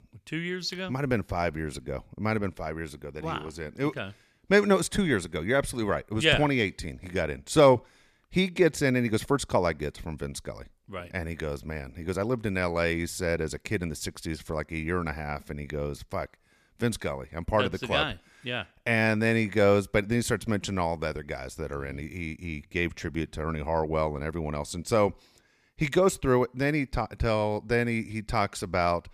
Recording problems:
none

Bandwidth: 14.5 kHz